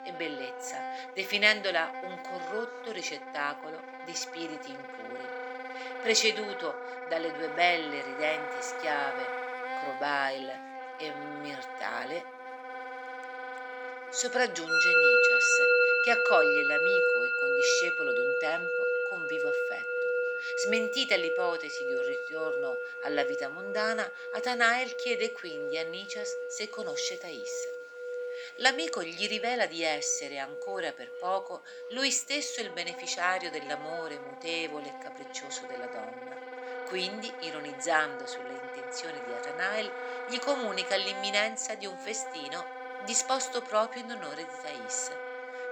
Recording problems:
thin; somewhat; fading below 350 Hz
background music; very loud; throughout; as loud as the speech
murmuring crowd; faint; throughout; 30 dB below the speech

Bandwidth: 17.5 kHz